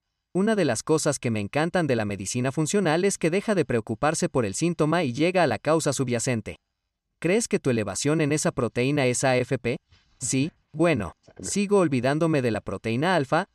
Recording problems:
none

